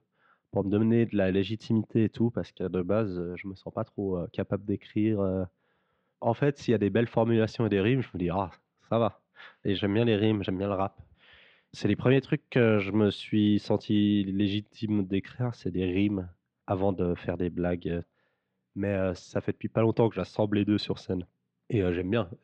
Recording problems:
muffled; slightly; fading above 3.5 kHz

